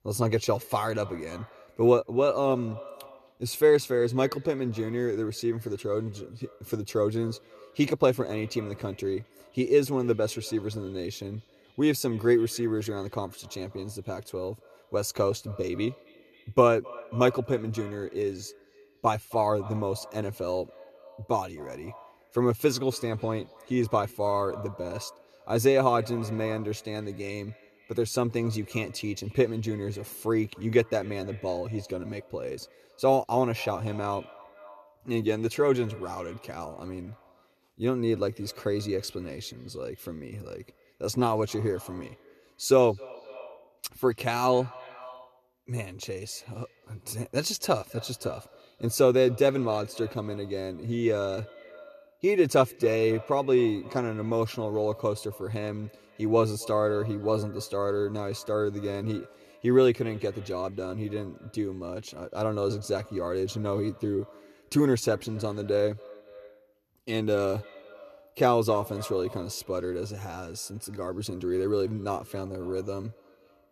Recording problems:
echo of what is said; faint; throughout; 260 ms later, 20 dB below the speech

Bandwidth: 13.5 kHz